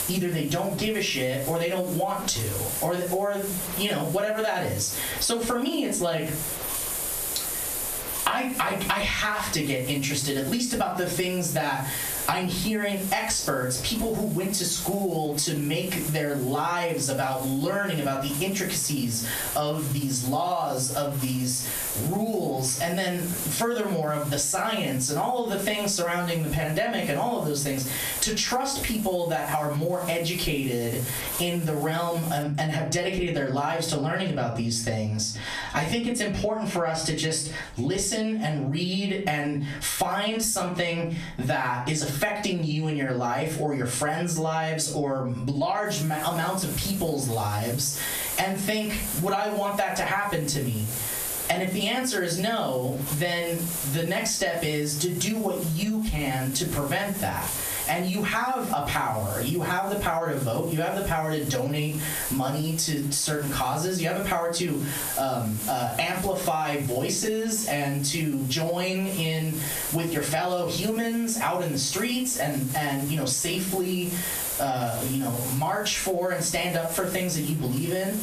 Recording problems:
off-mic speech; far
squashed, flat; heavily
room echo; very slight; dies away in 0.3 s
hiss; loud; until 32 s and from 46 s on; 7 dB below the speech

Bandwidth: 14.5 kHz